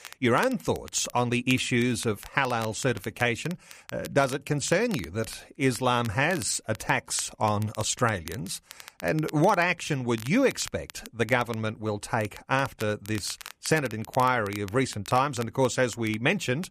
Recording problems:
crackle, like an old record; noticeable; 20 dB below the speech

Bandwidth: 14.5 kHz